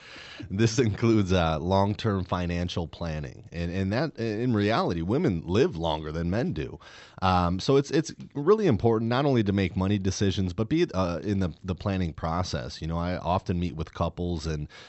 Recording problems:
high frequencies cut off; noticeable; nothing above 8 kHz

